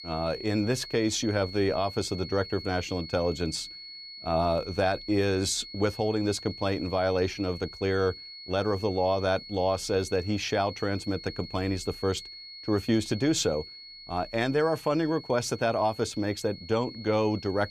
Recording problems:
high-pitched whine; noticeable; throughout; 4.5 kHz, 15 dB below the speech

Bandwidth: 15 kHz